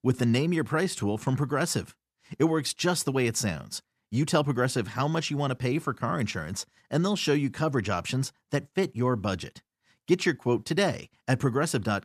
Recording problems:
none

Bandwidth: 14.5 kHz